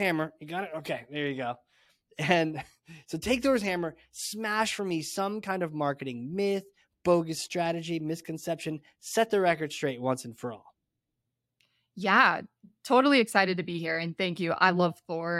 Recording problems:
abrupt cut into speech; at the start and the end

